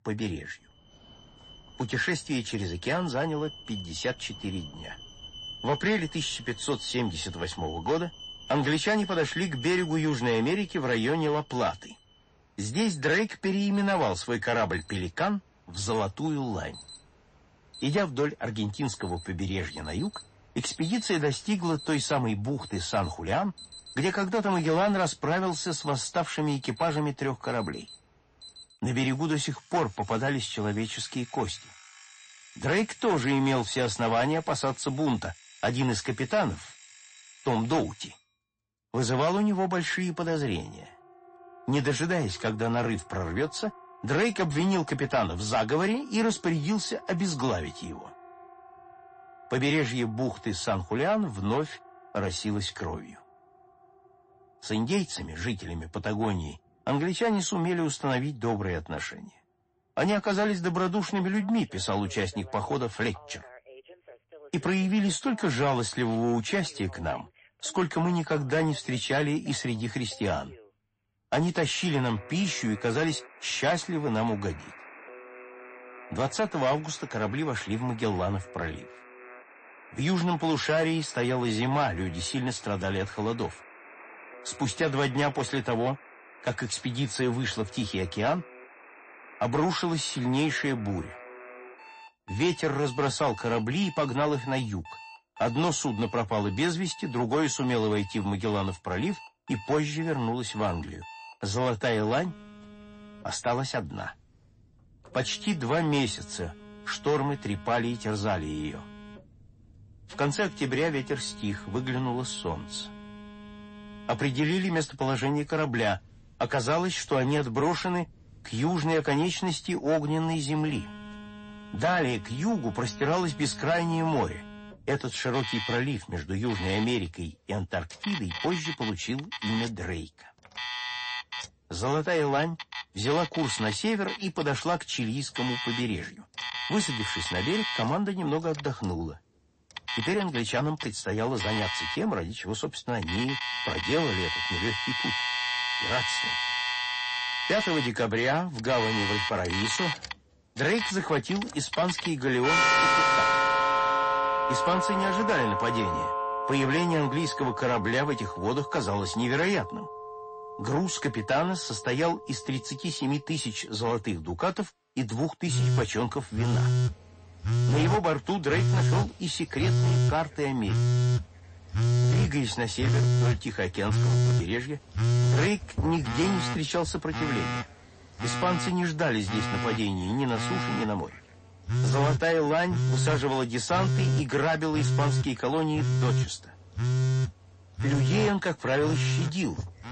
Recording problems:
distortion; slight; 10 dB below the speech
garbled, watery; slightly; nothing above 8 kHz
alarms or sirens; loud; throughout; 1 dB below the speech

